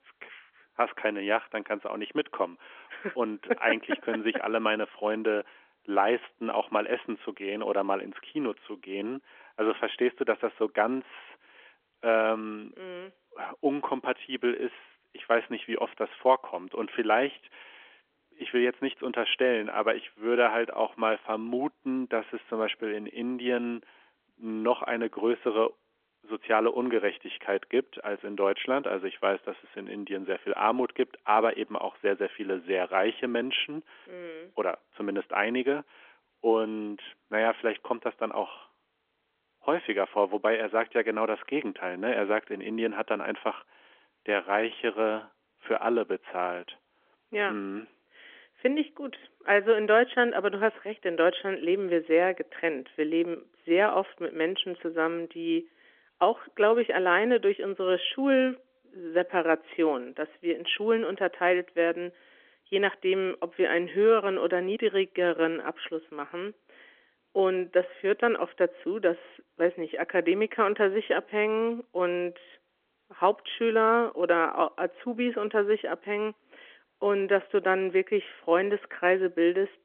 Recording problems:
phone-call audio; nothing above 3.5 kHz

